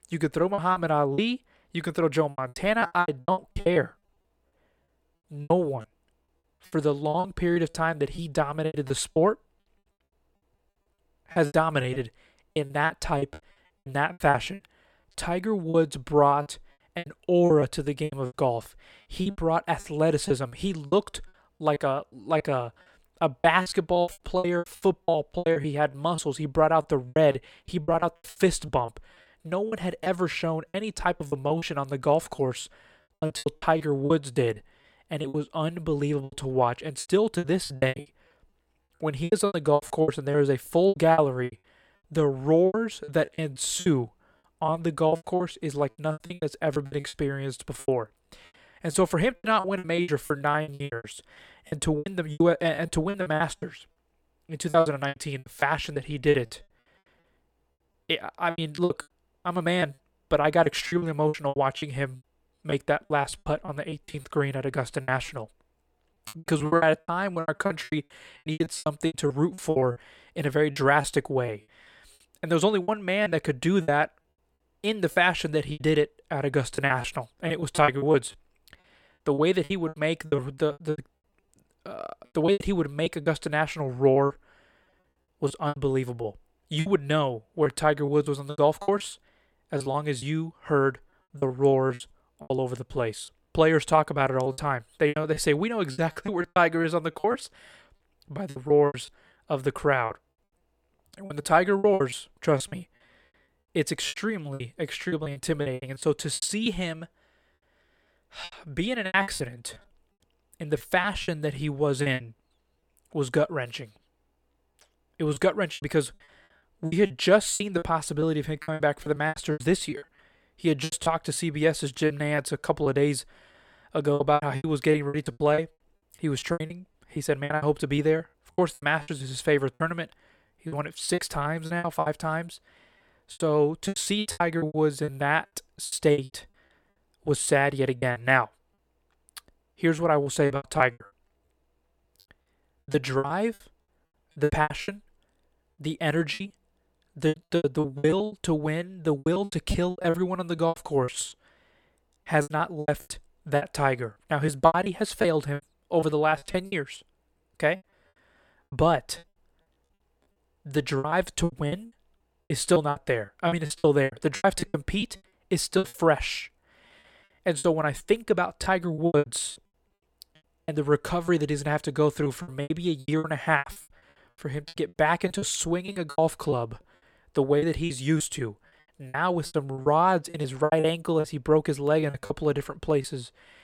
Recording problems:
choppy; very; 17% of the speech affected

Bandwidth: 18 kHz